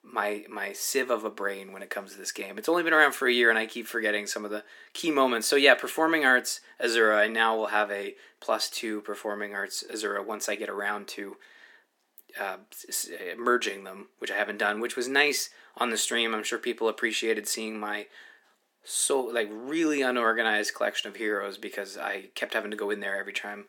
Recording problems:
thin; somewhat; fading below 300 Hz

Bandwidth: 17 kHz